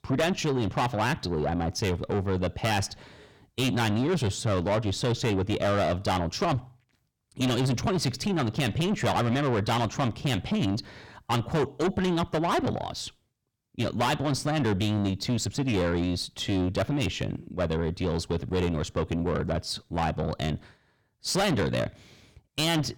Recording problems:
distortion; heavy; 6 dB below the speech

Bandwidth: 17.5 kHz